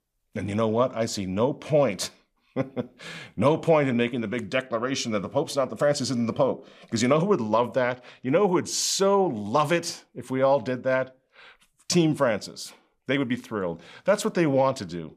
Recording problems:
none

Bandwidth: 15 kHz